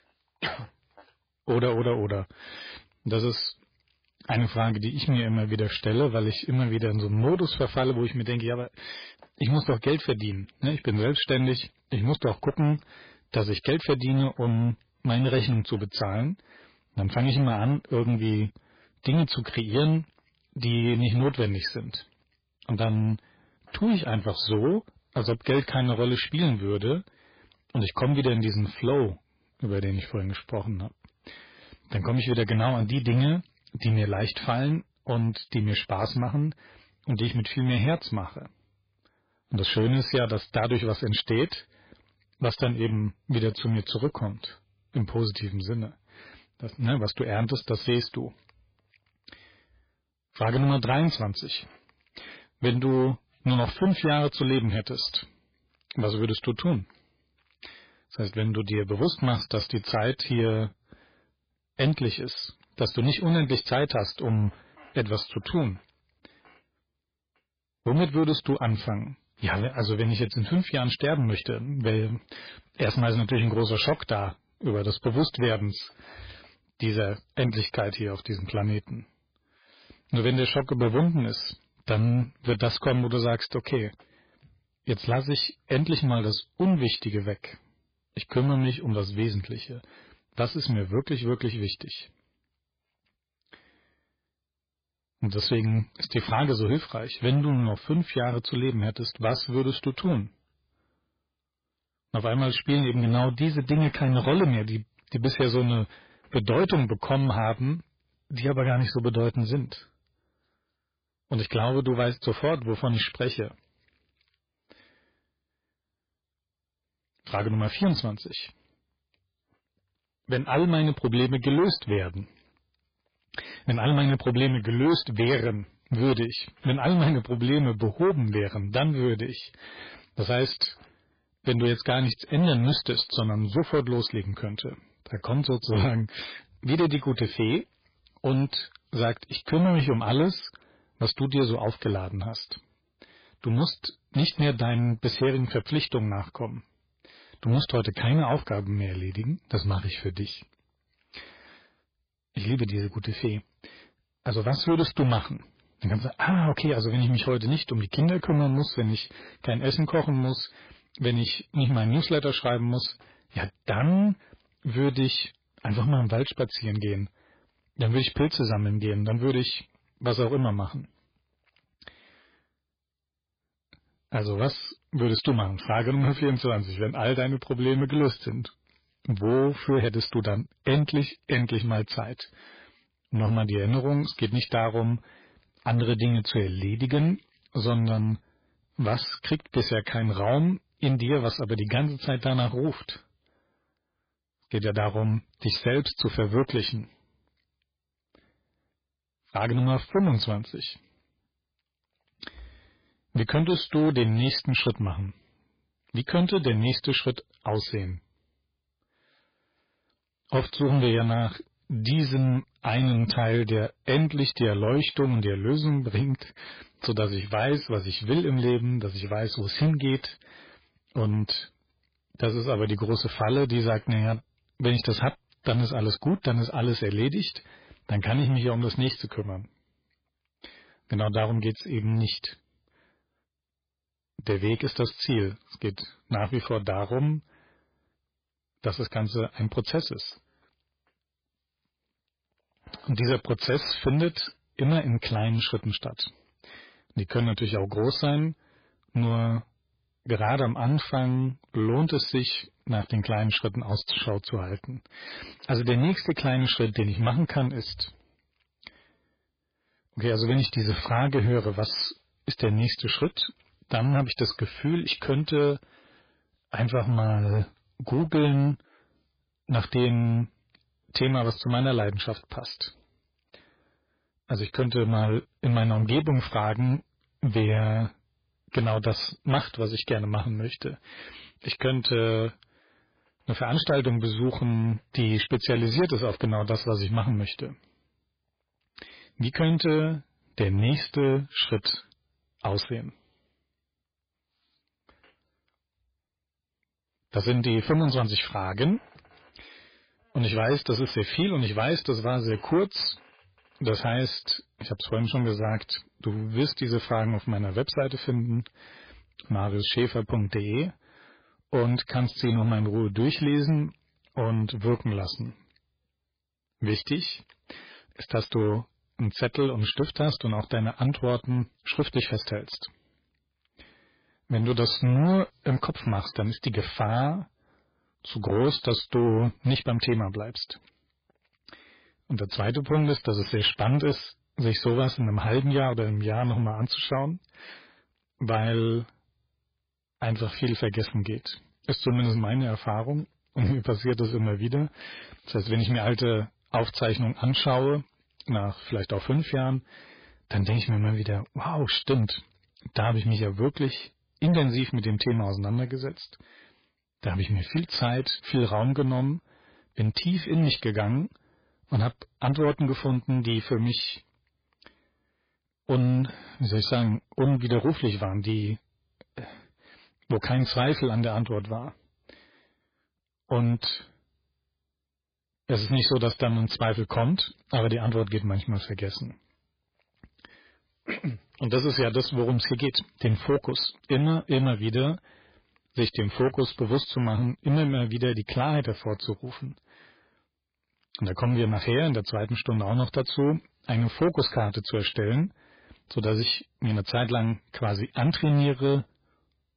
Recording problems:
garbled, watery; badly; nothing above 4.5 kHz
distortion; slight; 5% of the sound clipped

